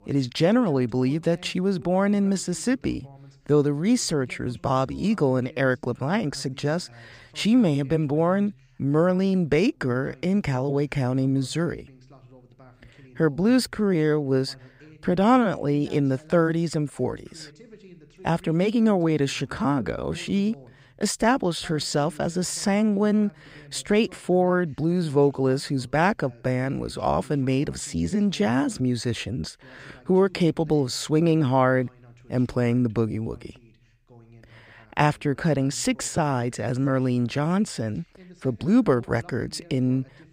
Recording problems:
voice in the background; faint; throughout; 25 dB below the speech

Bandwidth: 15.5 kHz